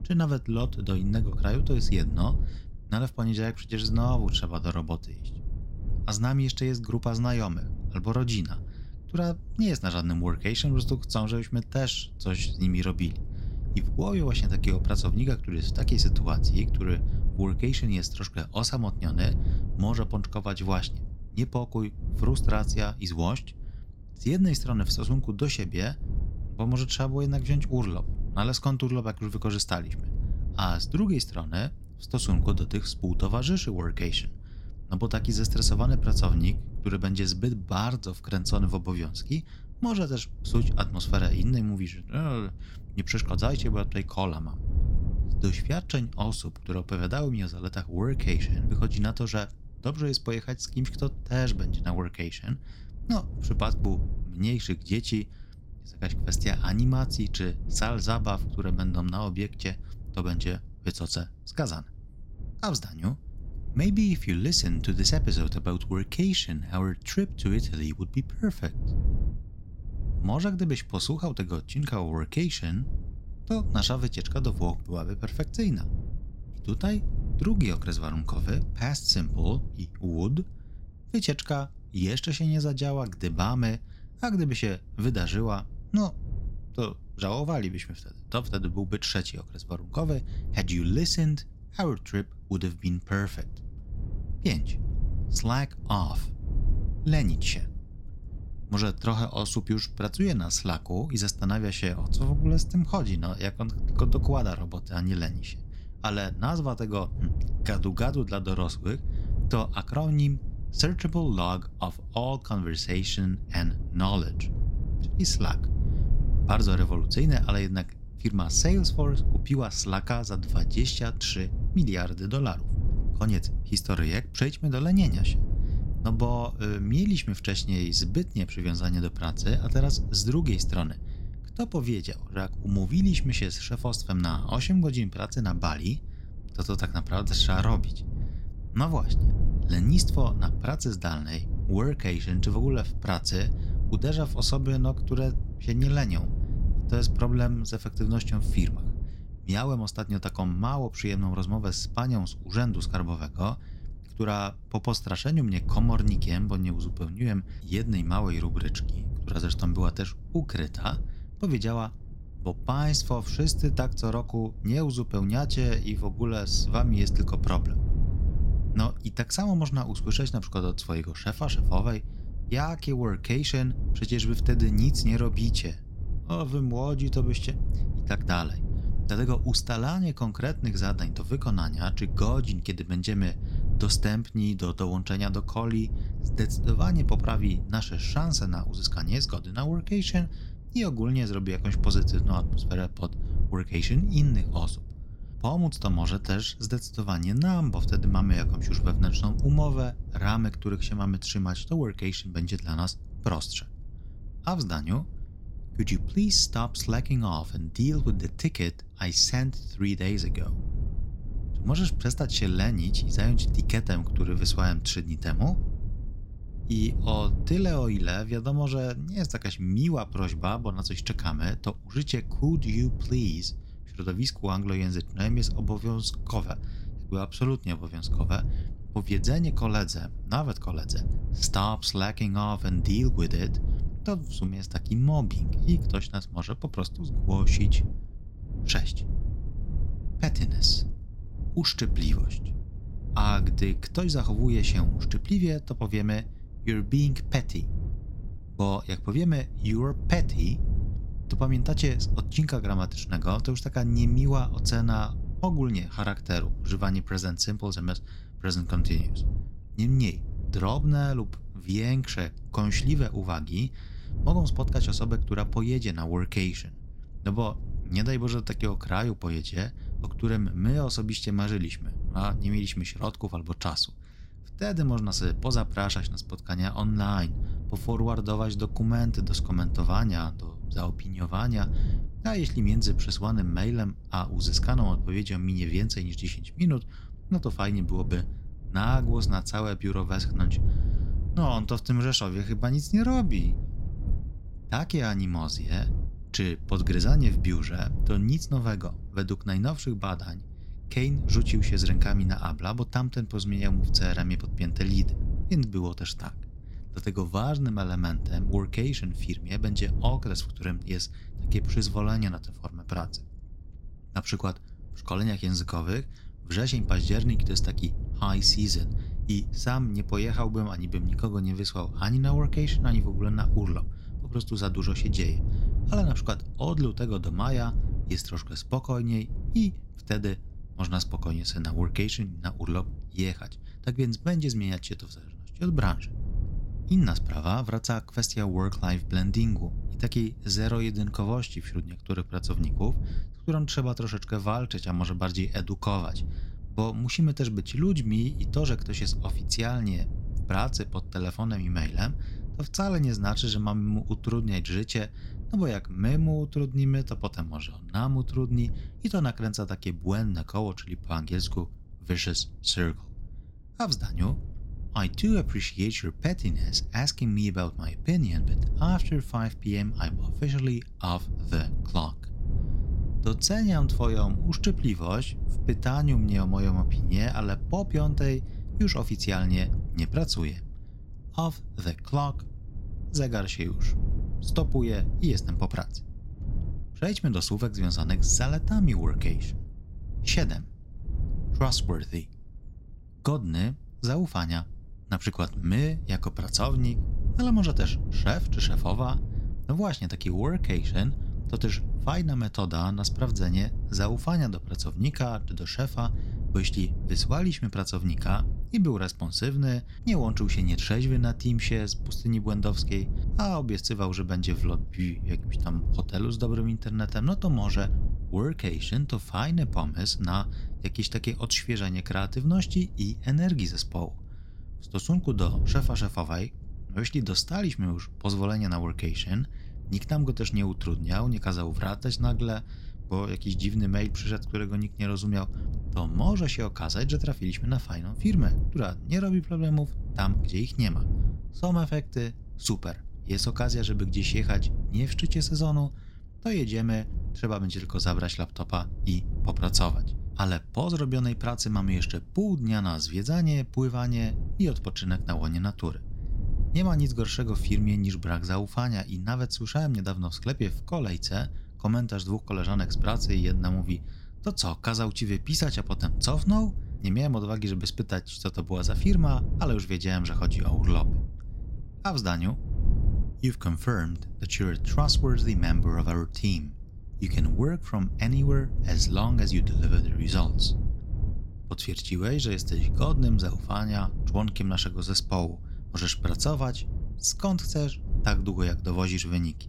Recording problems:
wind noise on the microphone; occasional gusts; 15 dB below the speech

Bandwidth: 16 kHz